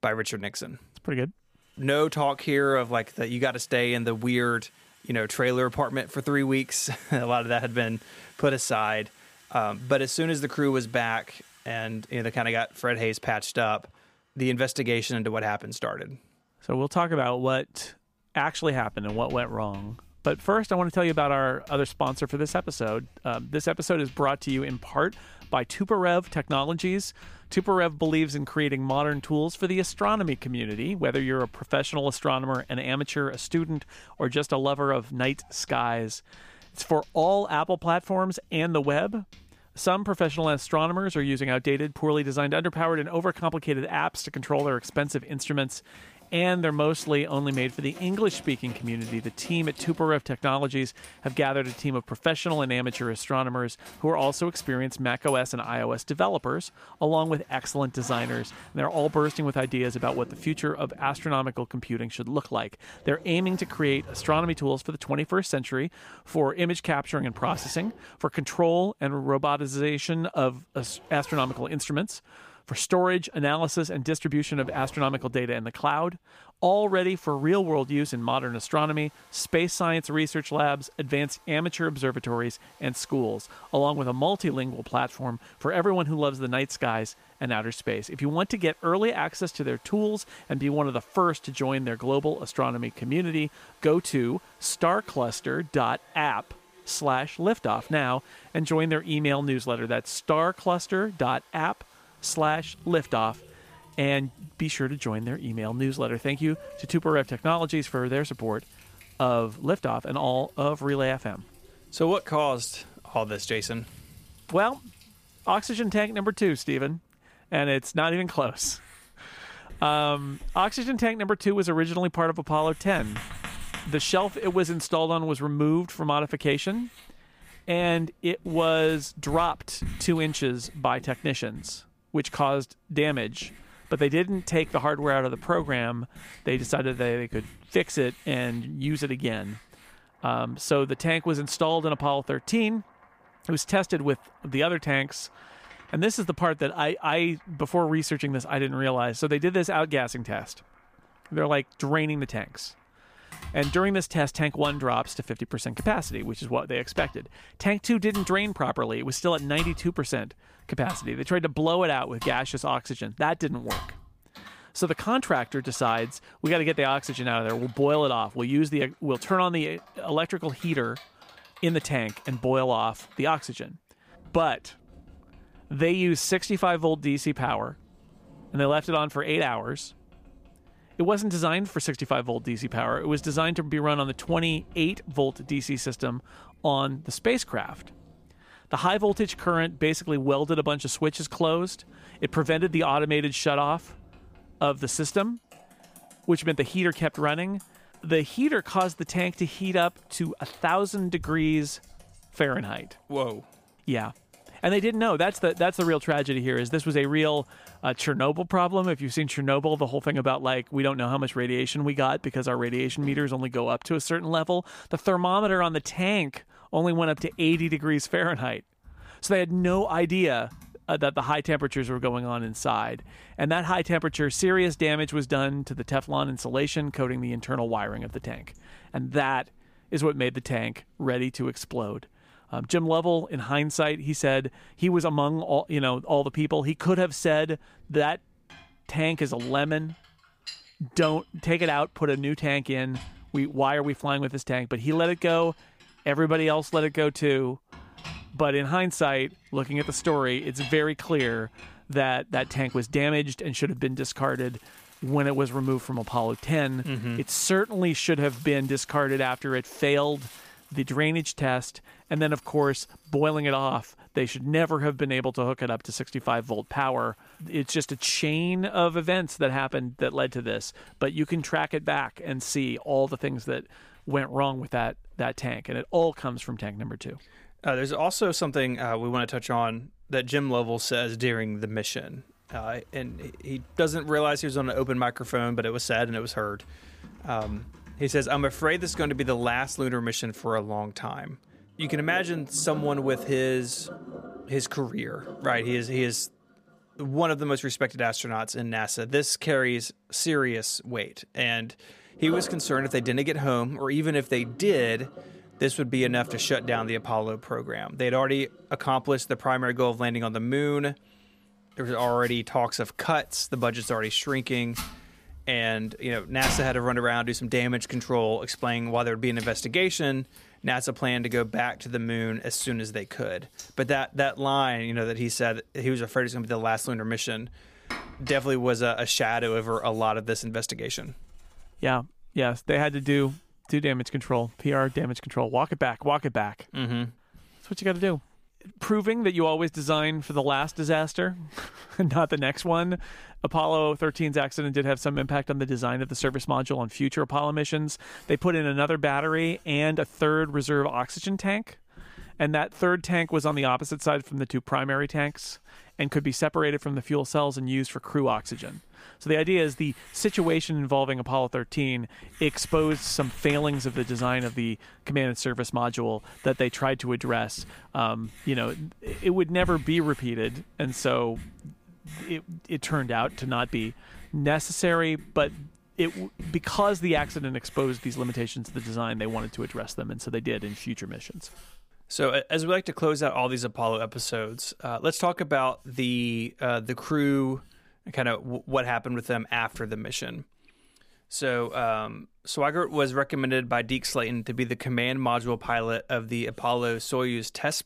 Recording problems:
household noises; faint; throughout; 20 dB below the speech

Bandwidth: 15 kHz